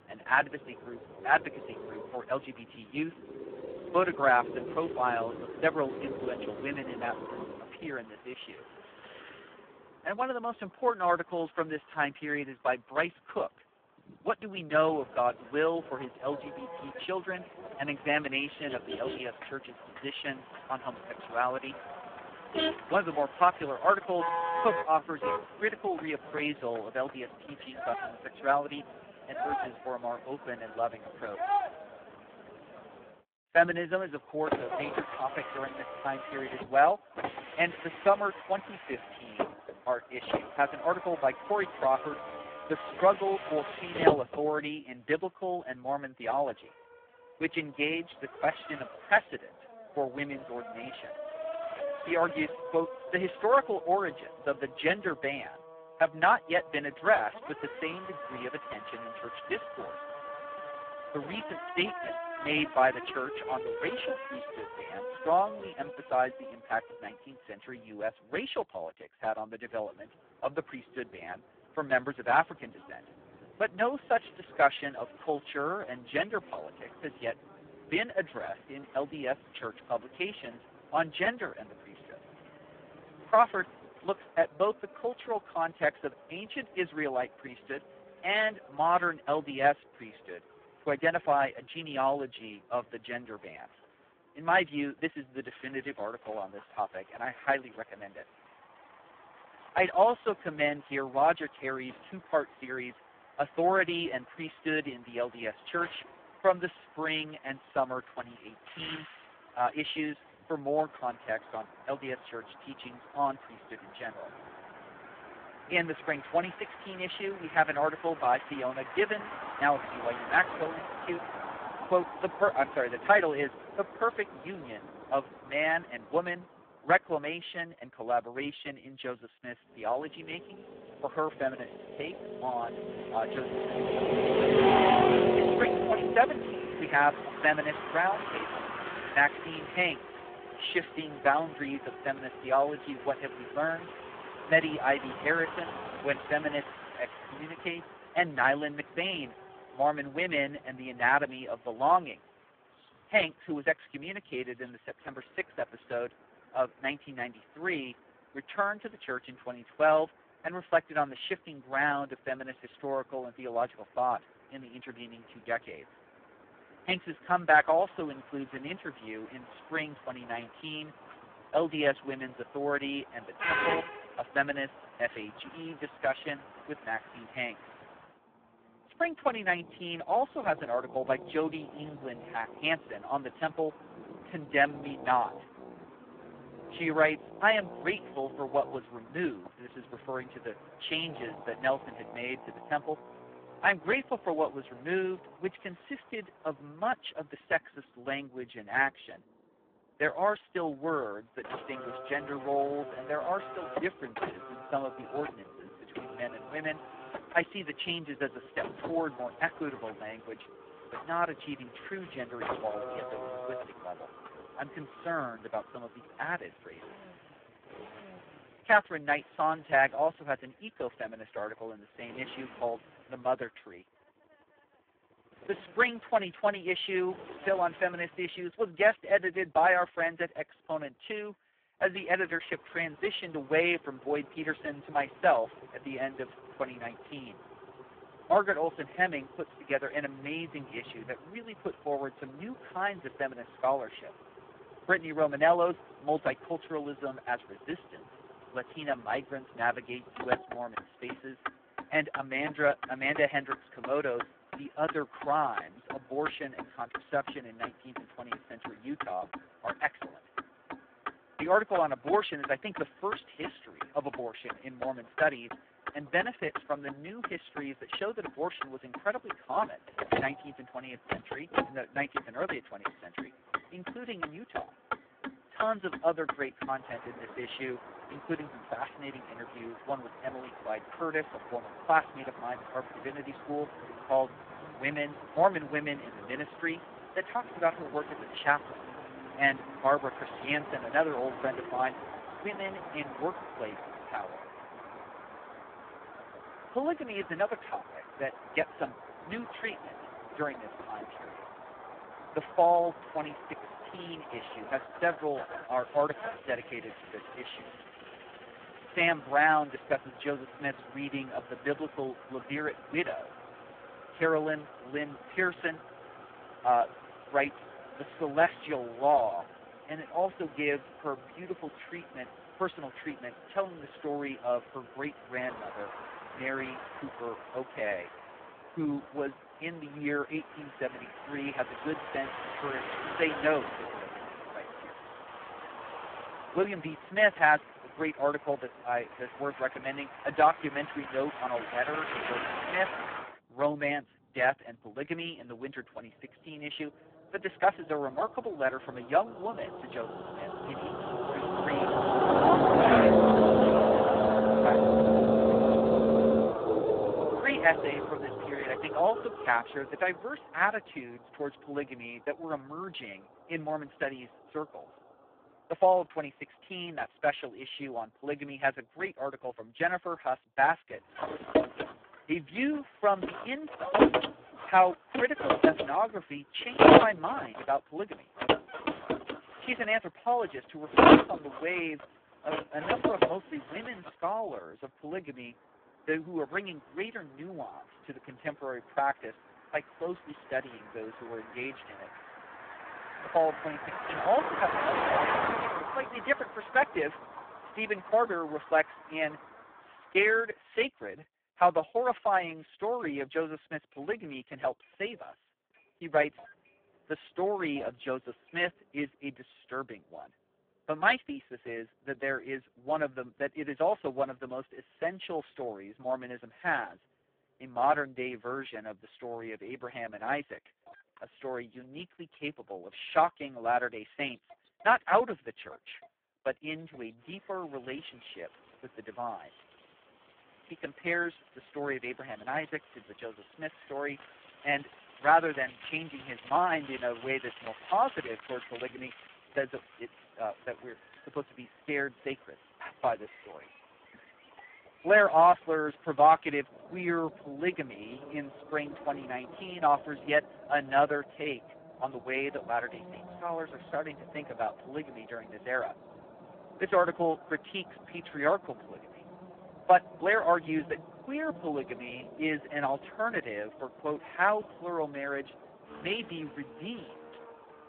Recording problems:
phone-call audio; poor line
traffic noise; loud; throughout; 2 dB below the speech

